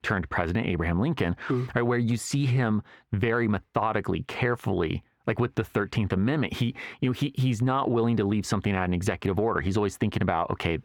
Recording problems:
squashed, flat; heavily
muffled; very slightly; fading above 3.5 kHz

